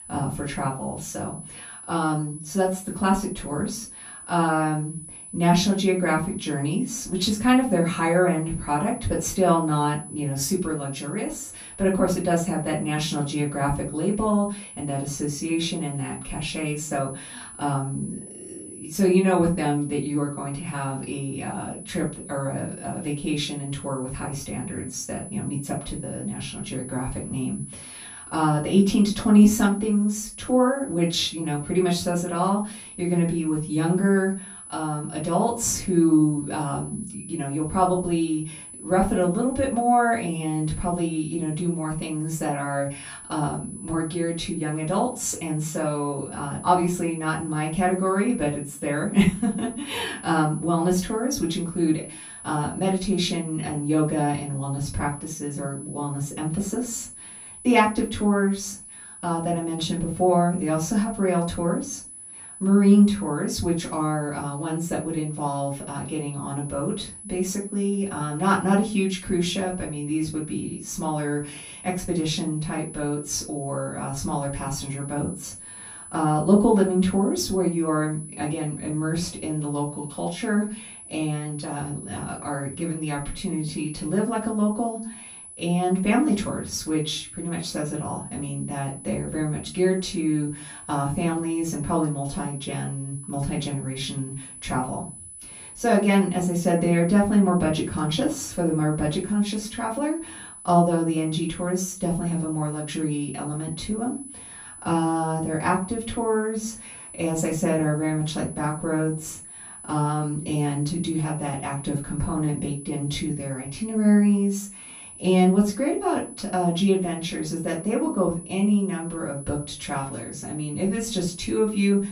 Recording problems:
off-mic speech; far
room echo; slight; dies away in 0.3 s
high-pitched whine; noticeable; throughout; 10 kHz, 15 dB below the speech

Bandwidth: 15.5 kHz